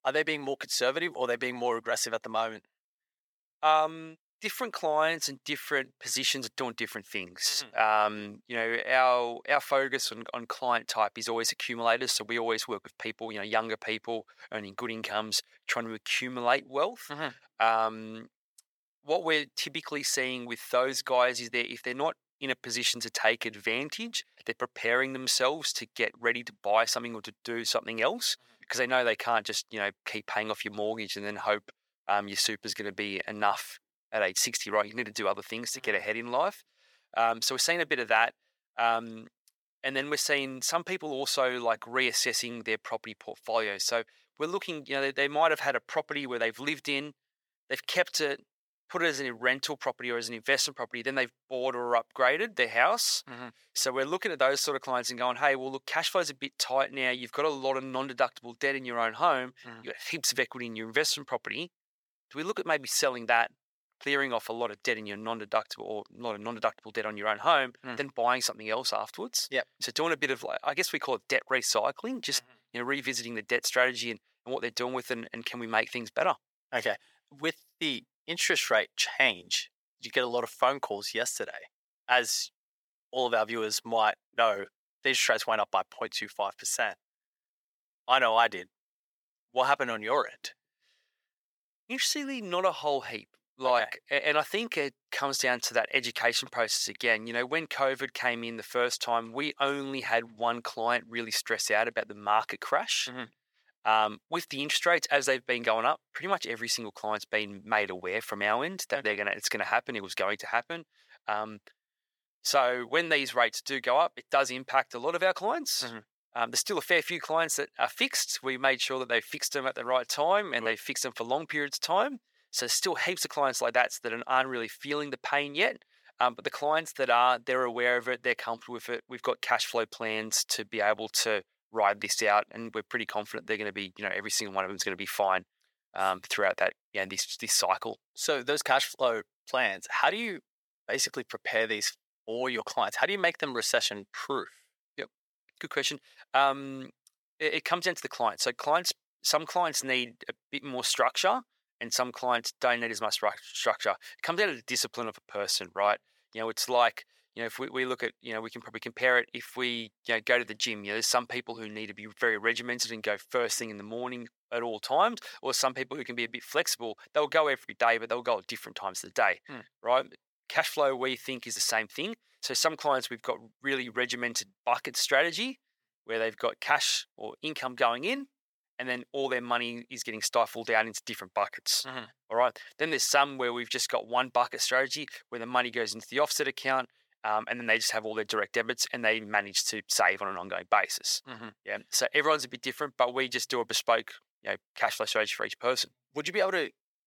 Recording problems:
thin; very; fading below 550 Hz

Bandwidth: 18.5 kHz